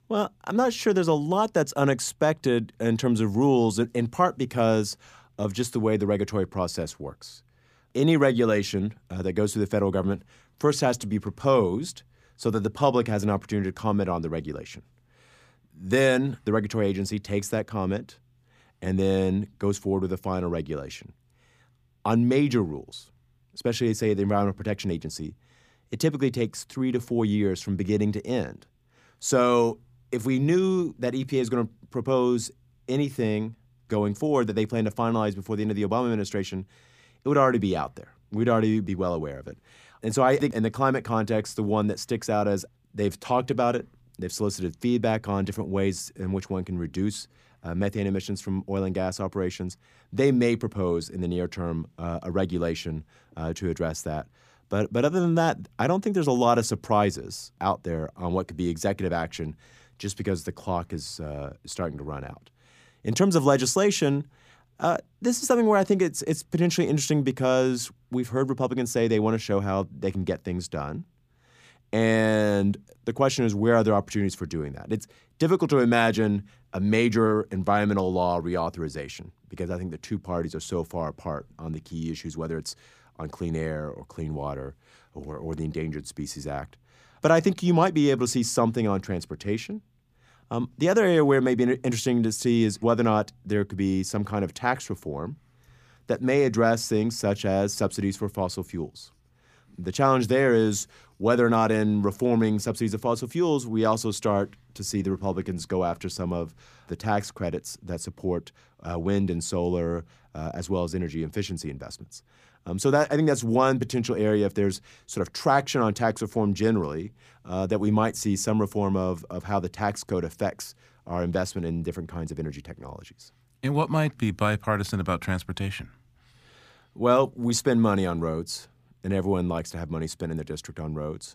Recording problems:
none

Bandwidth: 15 kHz